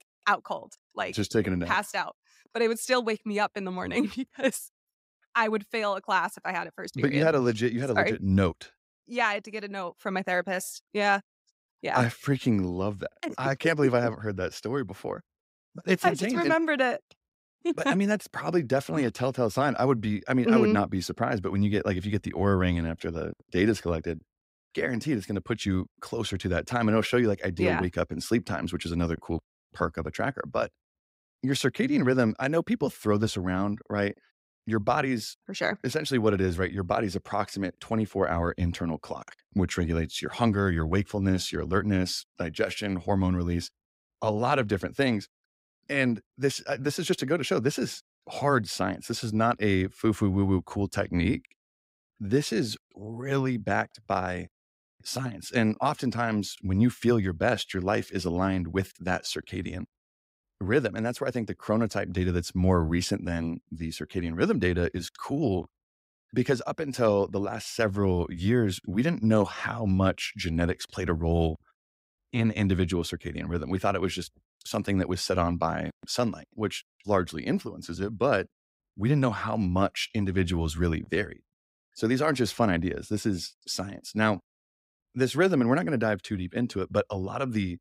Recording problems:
none

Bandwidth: 15.5 kHz